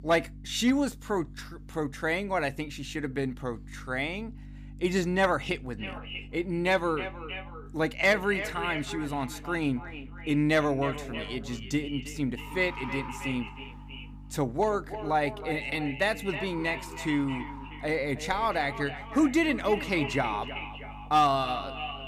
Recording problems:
echo of what is said; strong; from 6 s on; 320 ms later, 10 dB below the speech
animal sounds; noticeable; throughout; 20 dB below the speech
electrical hum; faint; throughout; 50 Hz, 30 dB below the speech

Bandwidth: 15 kHz